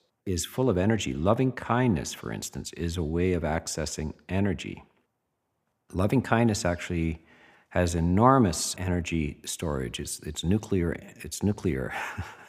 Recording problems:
none

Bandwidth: 15 kHz